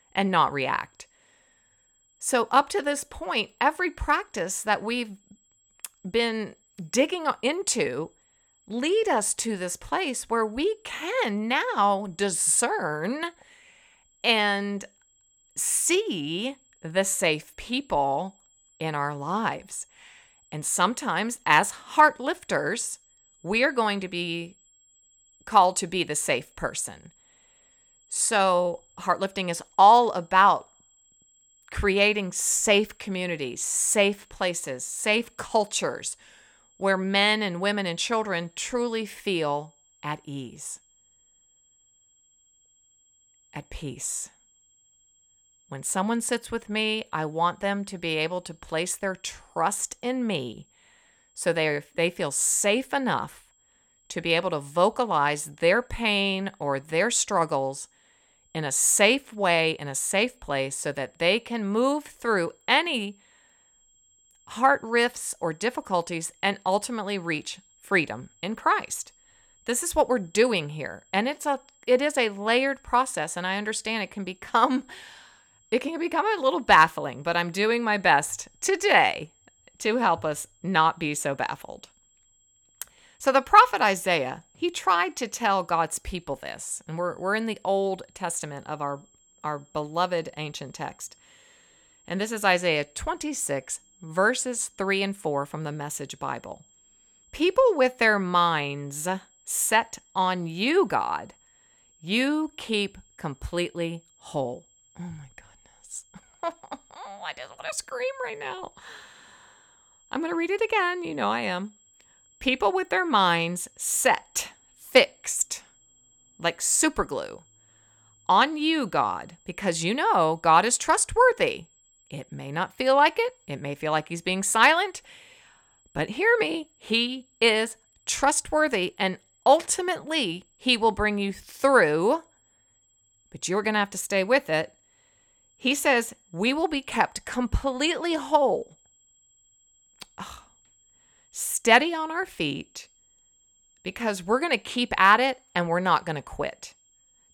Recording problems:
high-pitched whine; faint; throughout; 7.5 kHz, 35 dB below the speech

